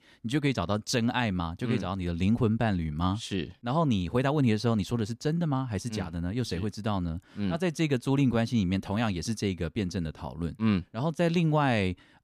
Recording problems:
none

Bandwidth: 15 kHz